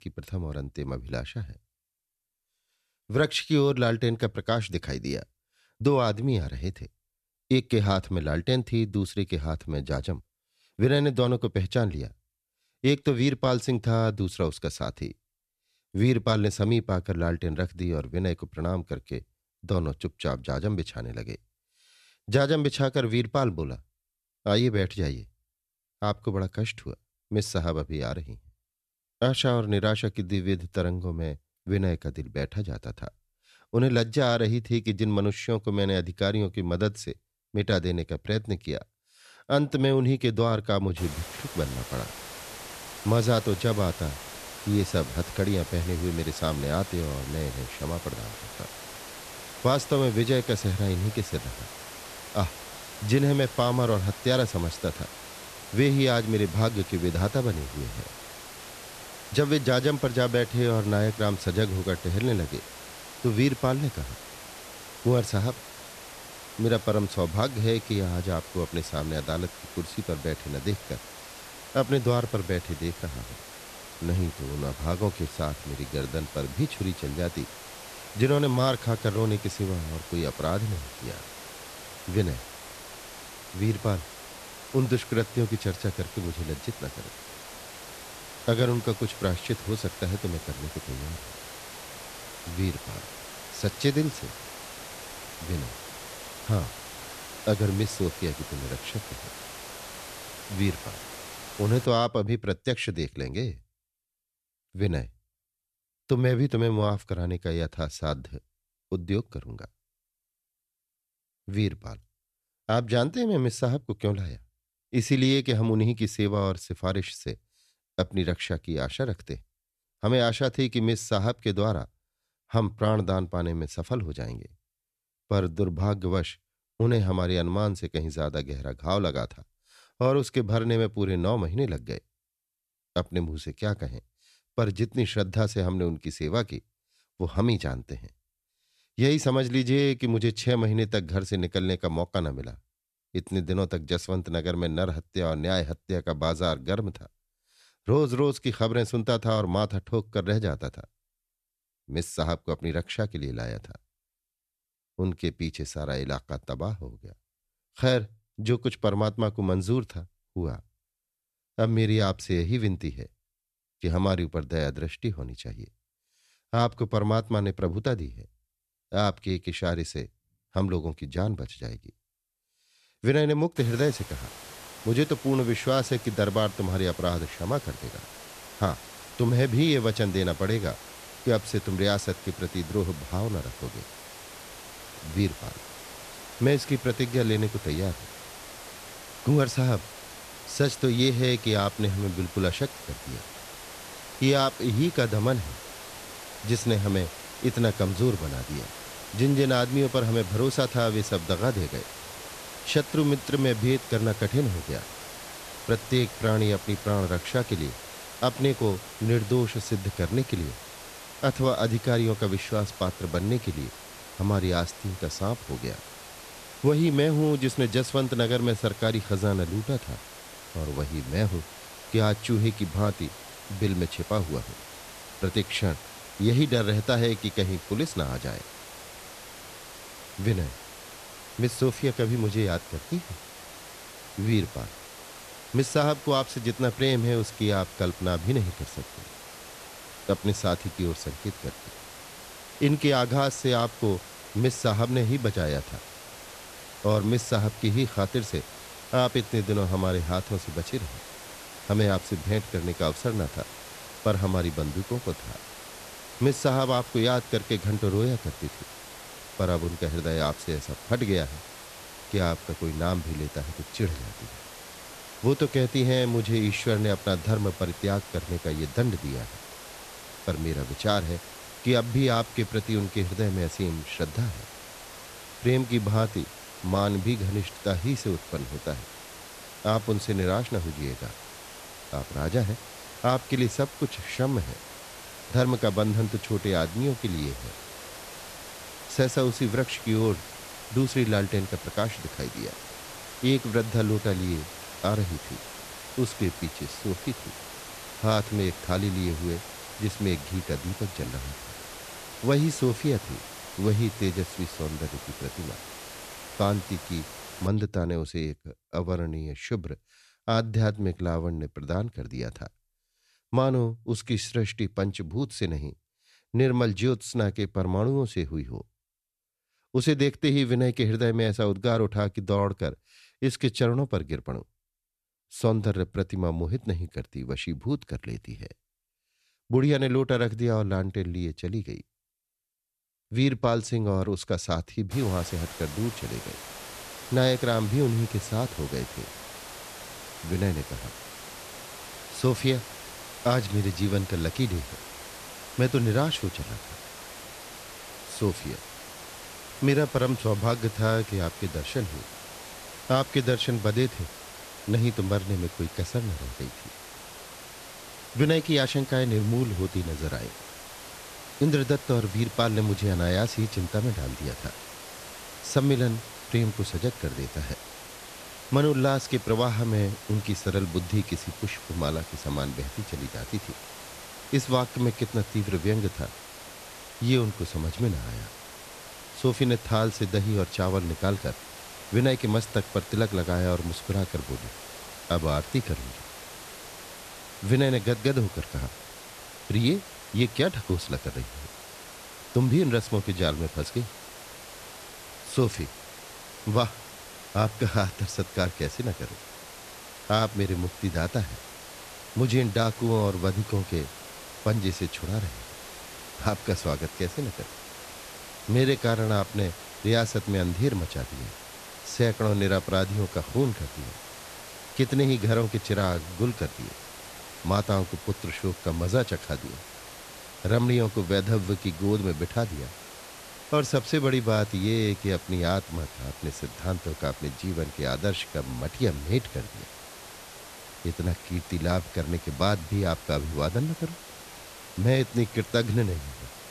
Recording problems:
hiss; noticeable; from 41 s to 1:42, from 2:54 to 5:07 and from 5:35 on; 15 dB below the speech

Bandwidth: 14 kHz